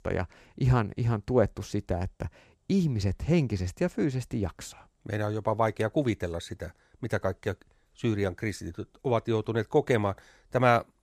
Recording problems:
none

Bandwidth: 14.5 kHz